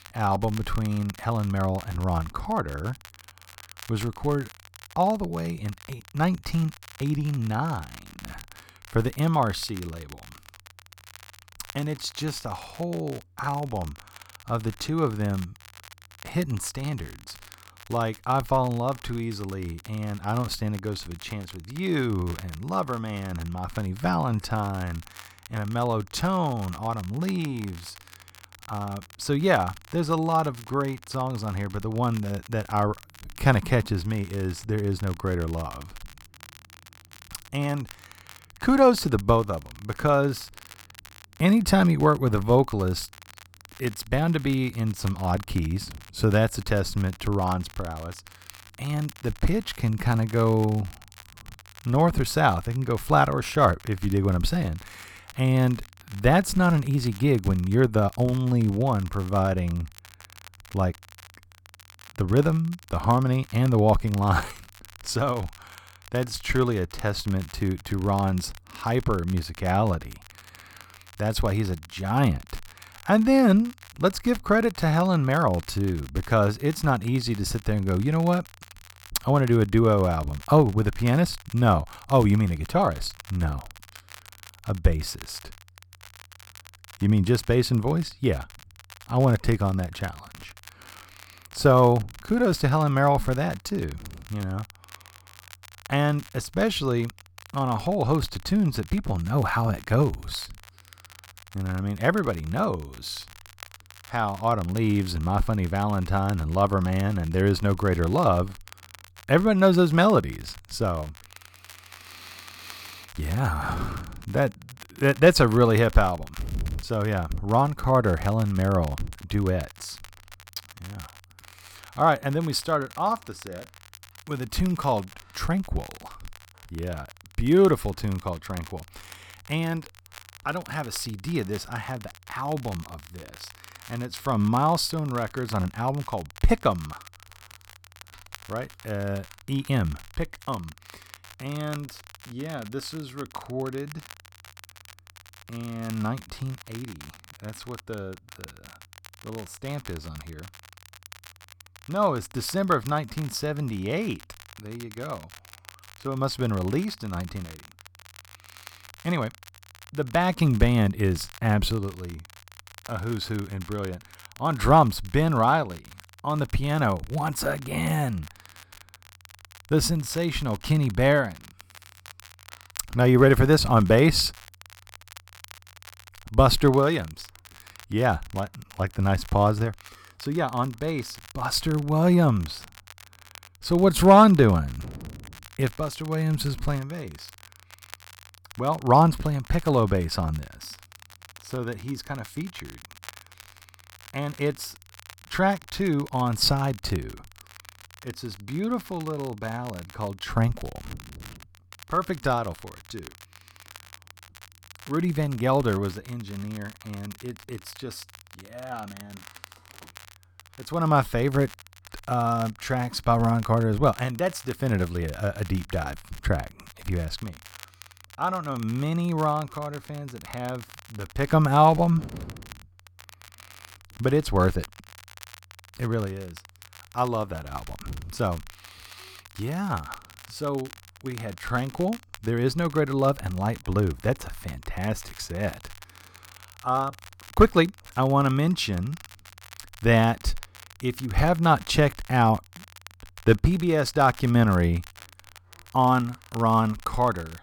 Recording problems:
crackle, like an old record; faint; 20 dB below the speech

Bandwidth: 18.5 kHz